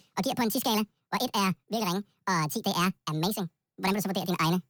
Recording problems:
wrong speed and pitch; too fast and too high; 1.7 times normal speed

